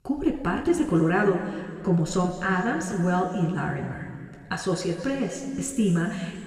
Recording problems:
room echo; noticeable; dies away in 2.2 s
off-mic speech; somewhat distant

